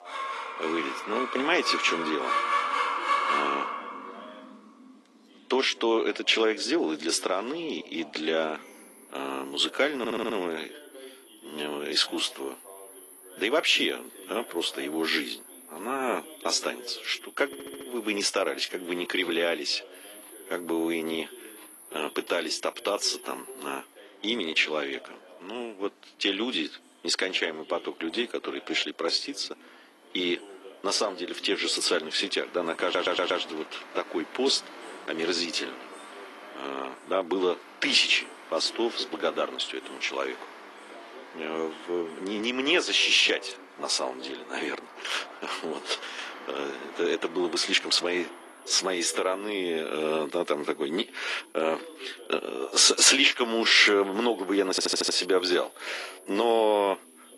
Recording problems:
thin; somewhat; fading below 300 Hz
garbled, watery; slightly
animal sounds; noticeable; throughout; 10 dB below the speech
voice in the background; faint; throughout; 25 dB below the speech
audio stuttering; 4 times, first at 10 s

